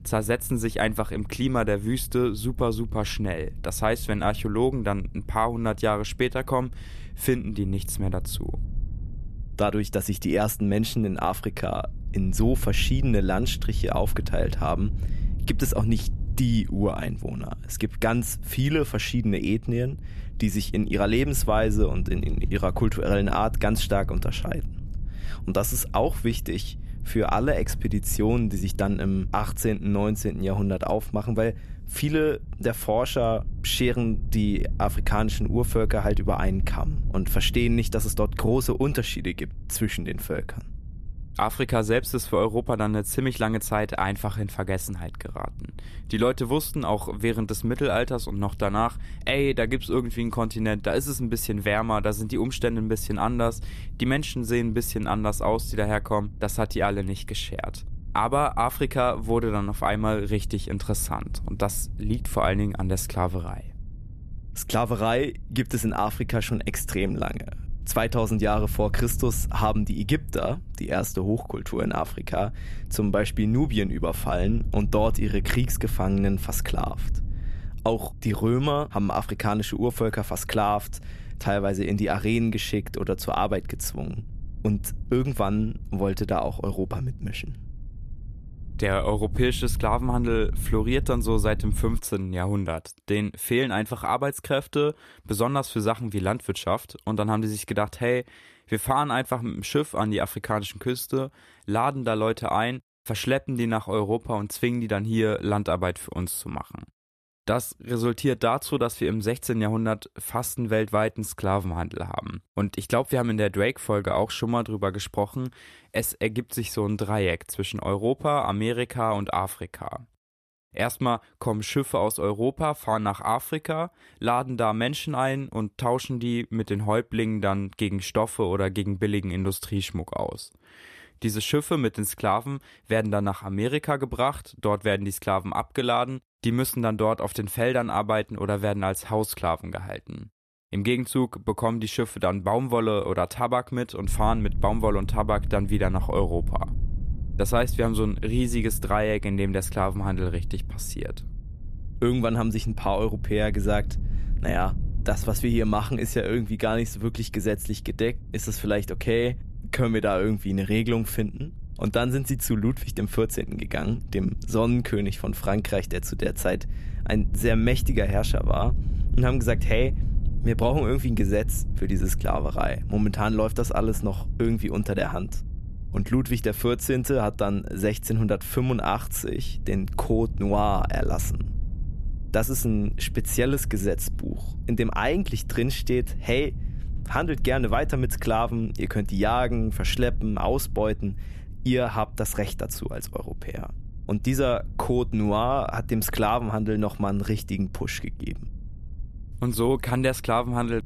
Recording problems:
low rumble; faint; until 1:32 and from 2:24 on; 25 dB below the speech

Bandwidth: 14 kHz